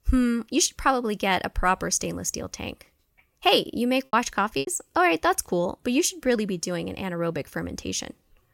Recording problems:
choppy; occasionally; 2% of the speech affected

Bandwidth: 16.5 kHz